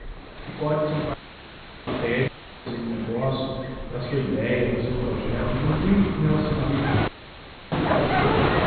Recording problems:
room echo; strong; dies away in 1.7 s
off-mic speech; far
high frequencies cut off; severe; nothing above 4.5 kHz
animal sounds; loud; throughout; 3 dB below the speech
rain or running water; loud; throughout; 4 dB below the speech
audio cutting out; filled with static; at 1 s for 0.5 s, at 2.5 s and at 7 s for 0.5 s

